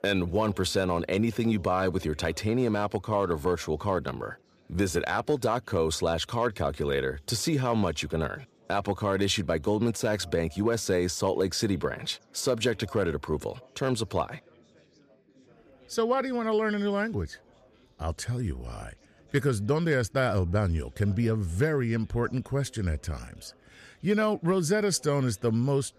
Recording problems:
chatter from many people; faint; throughout; 30 dB below the speech

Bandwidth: 14.5 kHz